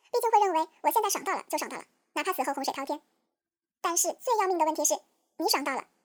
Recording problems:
wrong speed and pitch; too fast and too high; 1.7 times normal speed

